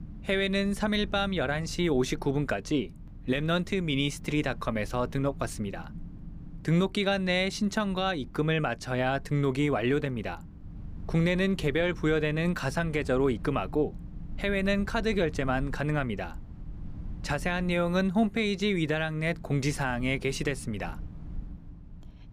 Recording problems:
low rumble; faint; throughout; 25 dB below the speech

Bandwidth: 15 kHz